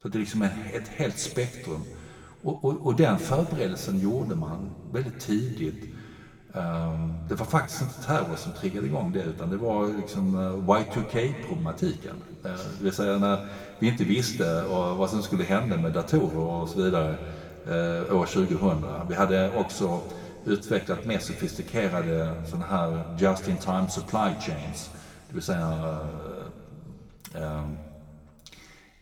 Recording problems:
room echo; slight; dies away in 2.1 s
off-mic speech; somewhat distant

